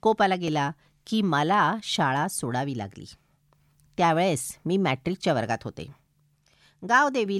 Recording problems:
abrupt cut into speech; at the end

